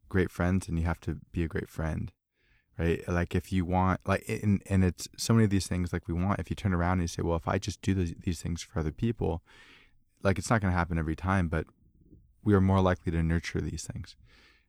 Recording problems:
none

